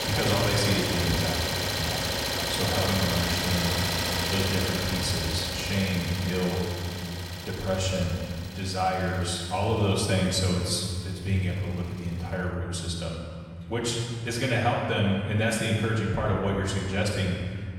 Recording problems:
off-mic speech; far
room echo; noticeable; dies away in 2.1 s
traffic noise; loud; throughout; 1 dB below the speech

